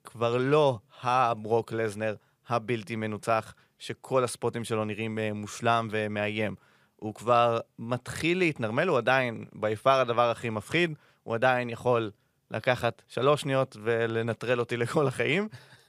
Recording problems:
none

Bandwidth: 15 kHz